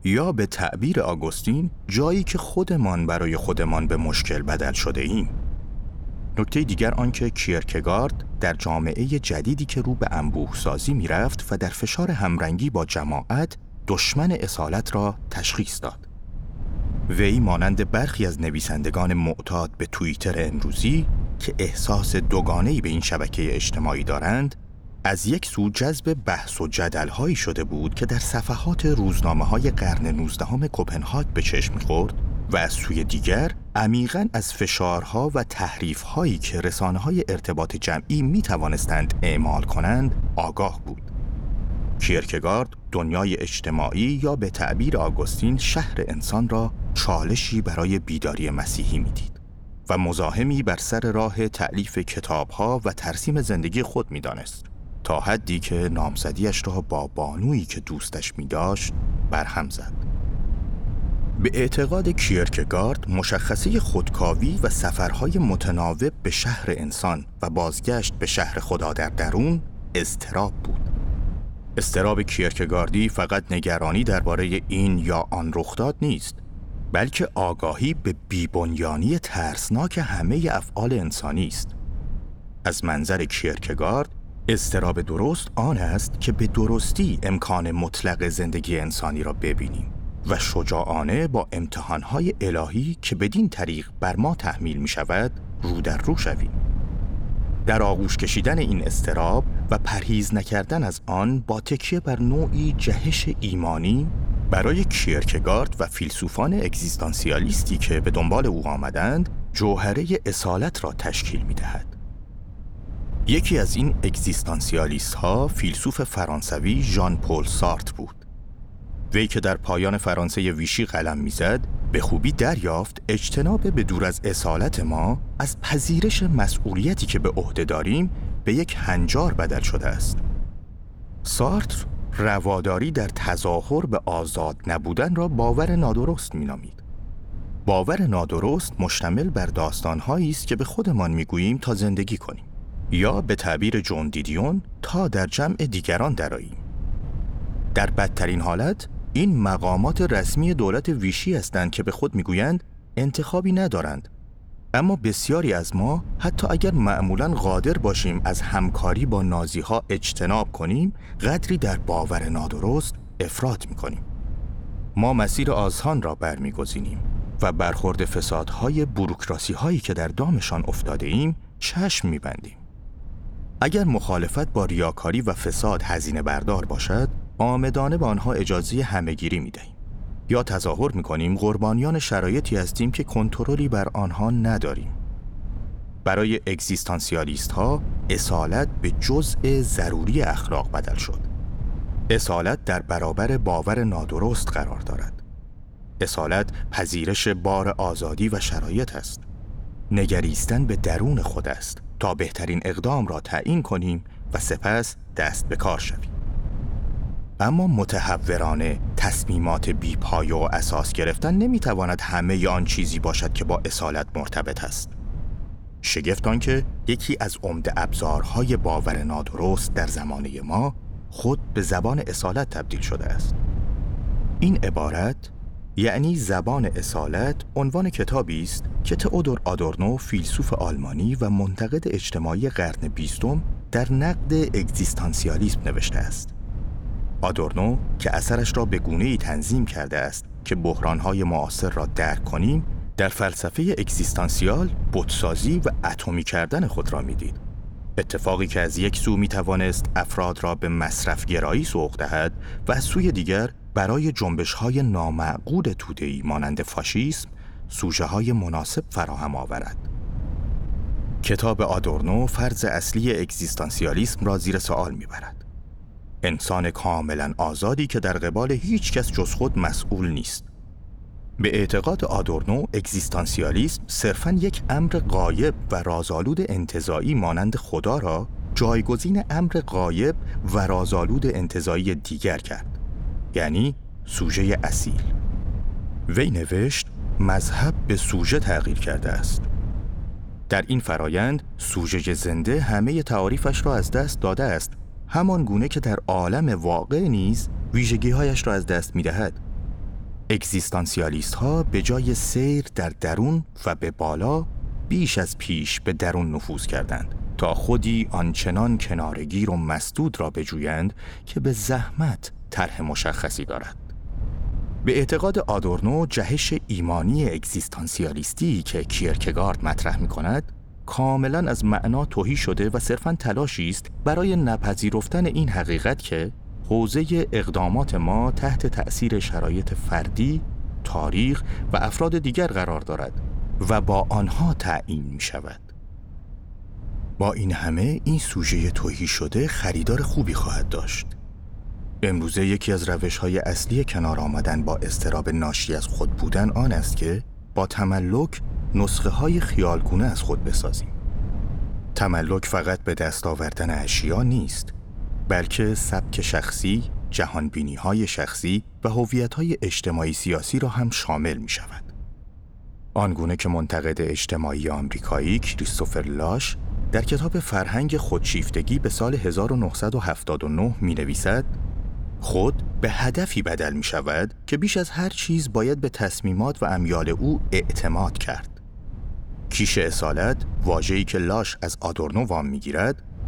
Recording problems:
wind noise on the microphone; occasional gusts; 20 dB below the speech

